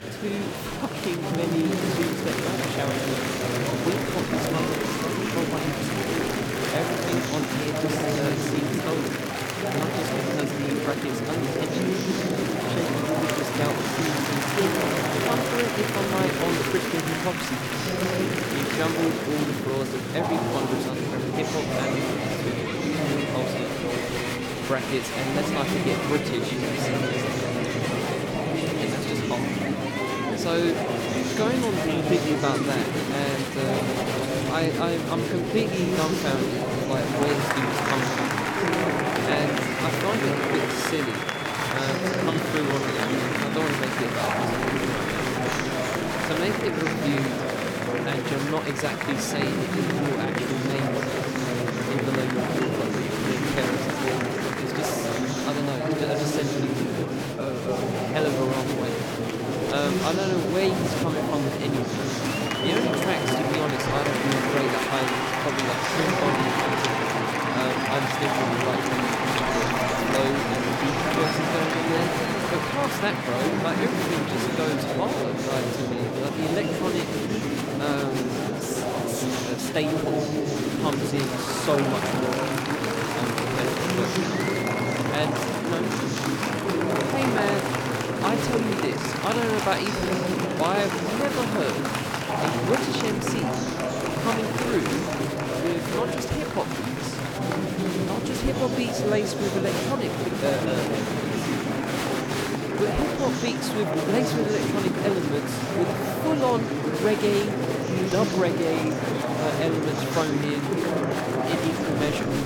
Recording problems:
murmuring crowd; very loud; throughout; 4 dB above the speech

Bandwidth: 18.5 kHz